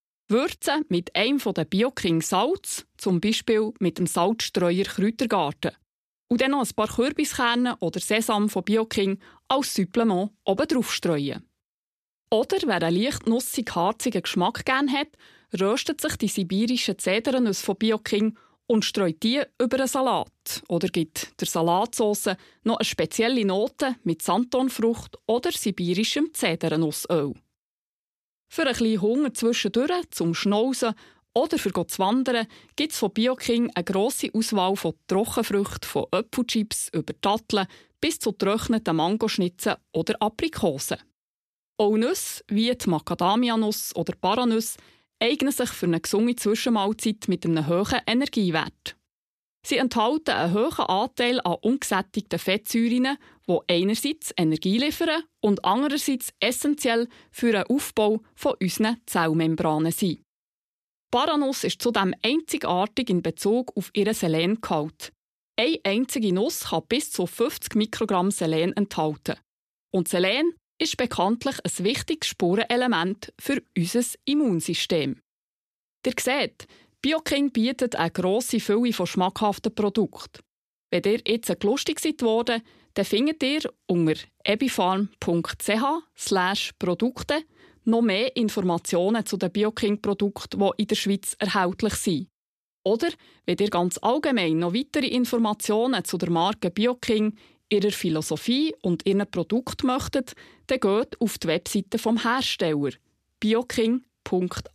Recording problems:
none

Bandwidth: 14.5 kHz